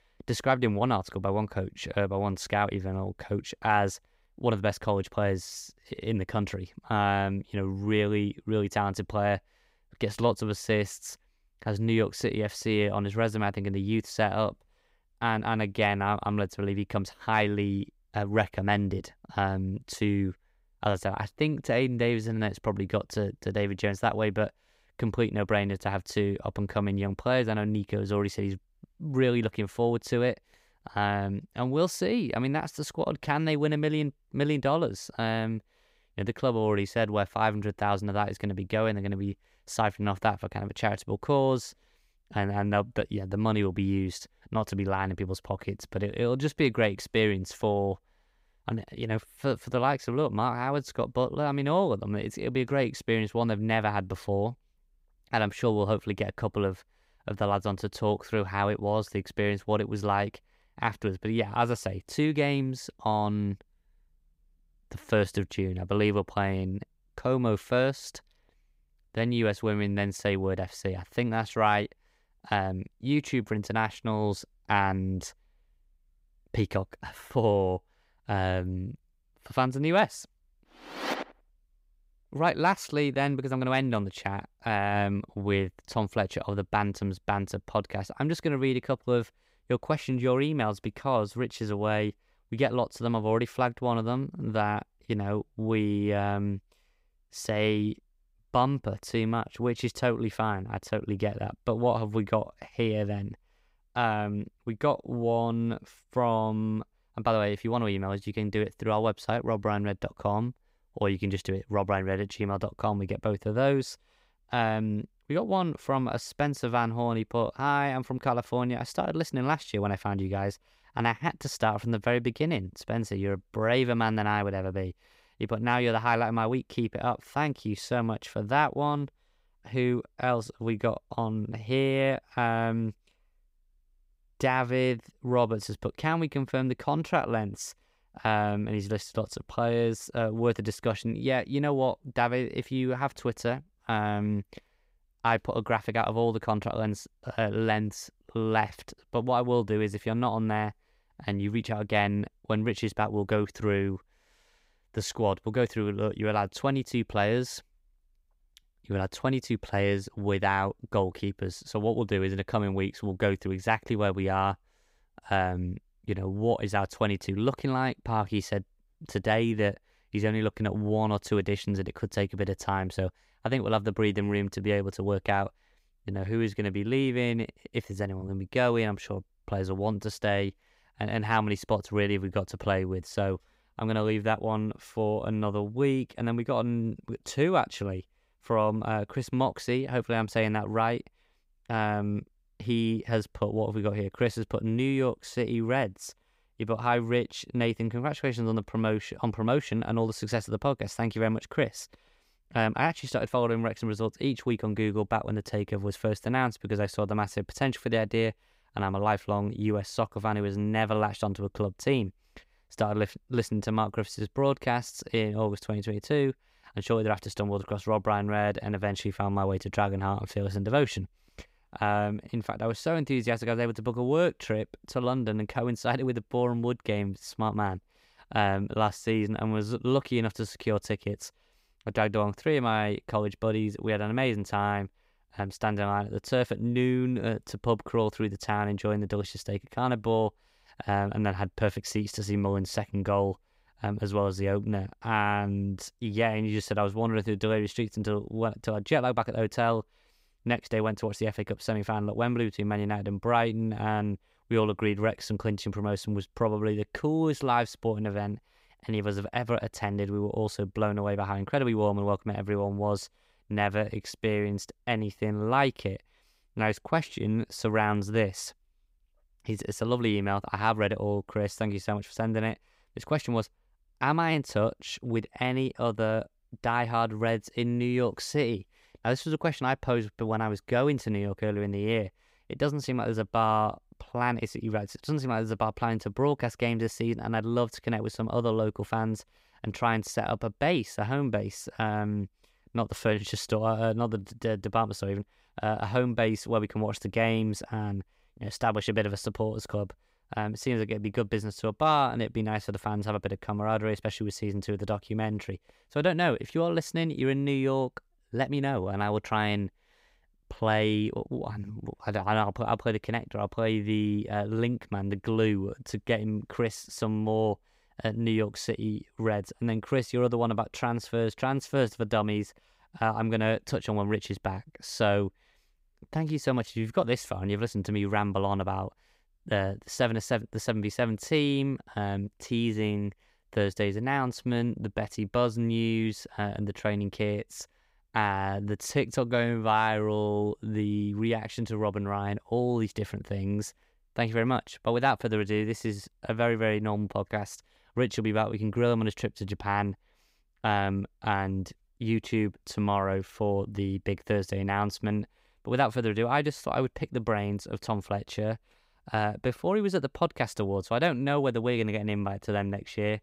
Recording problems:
none

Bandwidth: 15.5 kHz